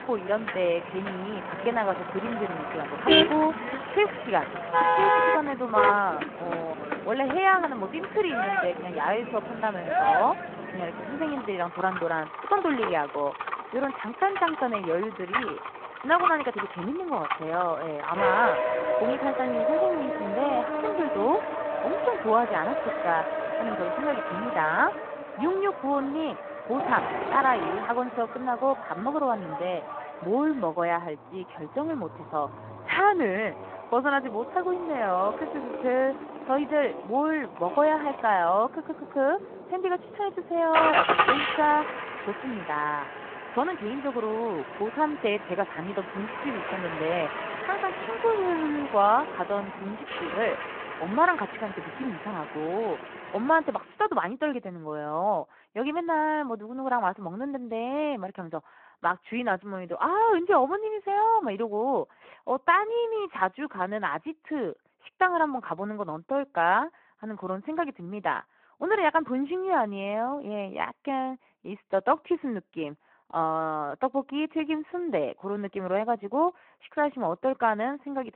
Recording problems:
phone-call audio
traffic noise; loud; until 54 s; 2 dB below the speech

